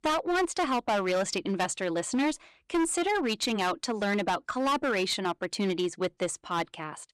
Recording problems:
distortion; heavy; 14% of the sound clipped

